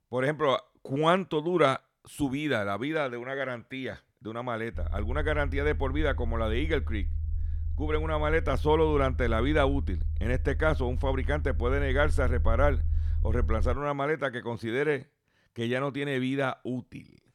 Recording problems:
low rumble; faint; from 5 to 14 s; 20 dB below the speech

